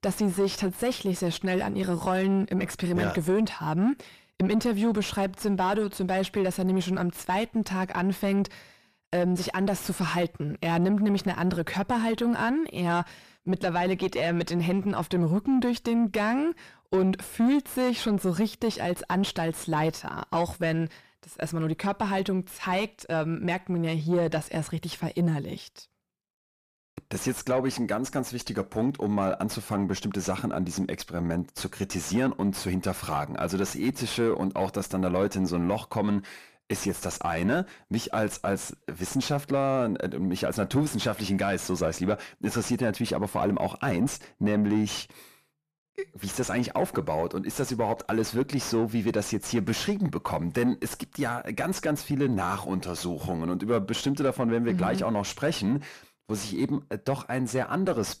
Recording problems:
distortion; slight; 9 dB below the speech

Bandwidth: 14.5 kHz